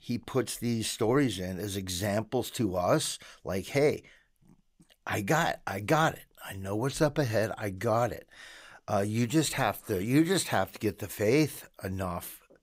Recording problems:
none

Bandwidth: 15.5 kHz